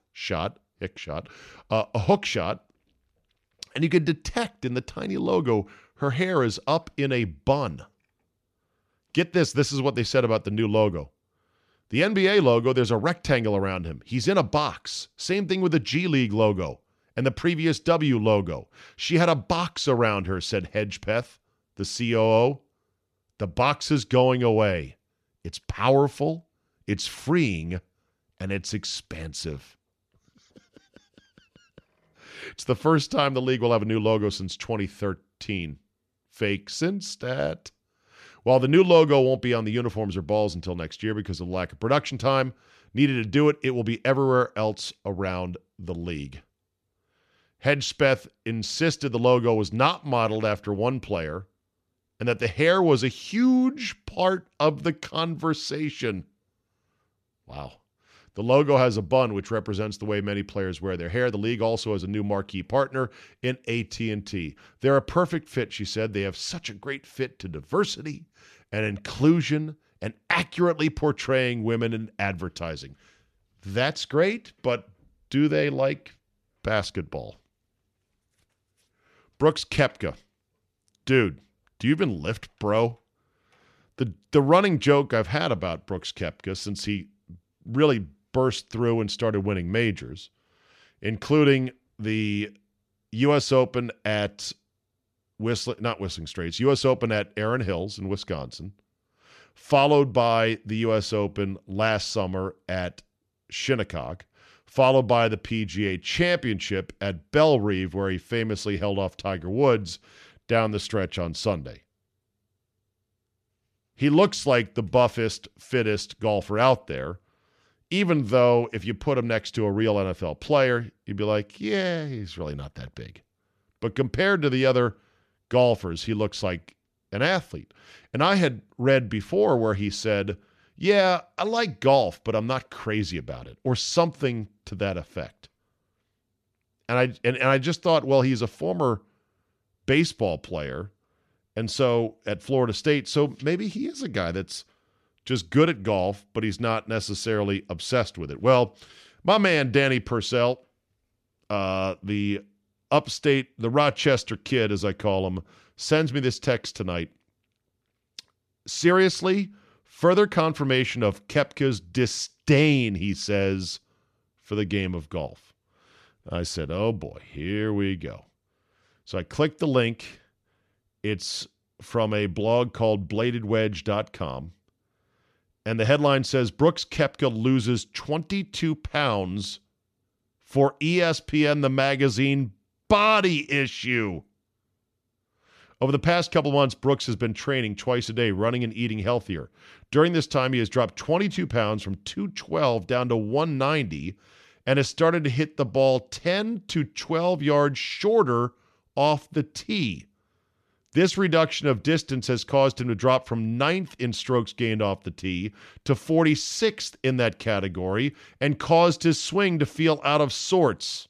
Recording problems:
none

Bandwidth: 13.5 kHz